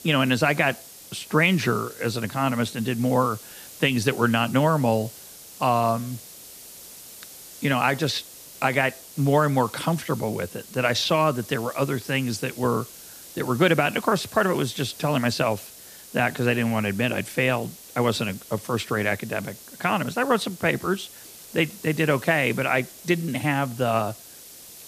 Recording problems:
hiss; noticeable; throughout; 15 dB below the speech

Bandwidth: 14.5 kHz